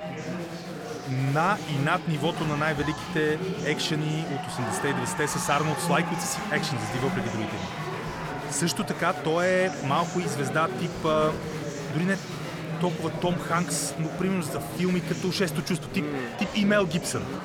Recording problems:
murmuring crowd; loud; throughout; 5 dB below the speech

